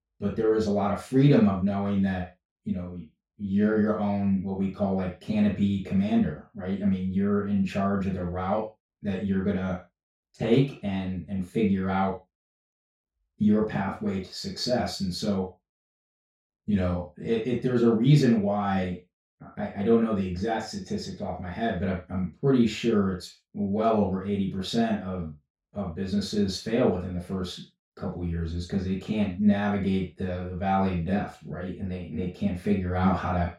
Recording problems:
off-mic speech; far
room echo; noticeable; dies away in 0.3 s

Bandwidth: 16 kHz